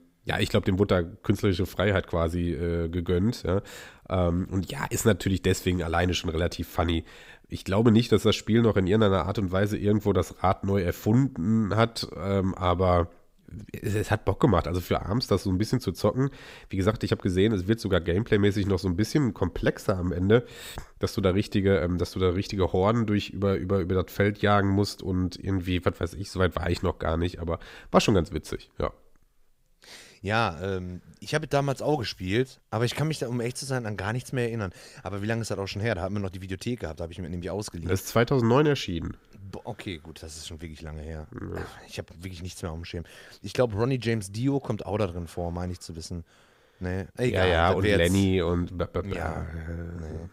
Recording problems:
none

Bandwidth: 15.5 kHz